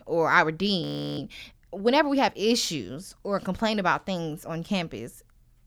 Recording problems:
audio freezing; at 1 s

